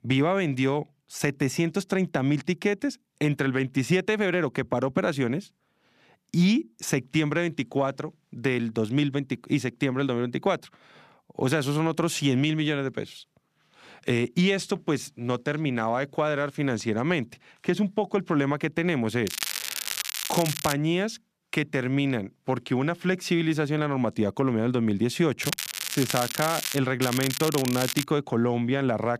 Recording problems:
crackling; loud; from 19 to 21 s, from 25 to 27 s and from 27 to 28 s; 4 dB below the speech

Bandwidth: 14.5 kHz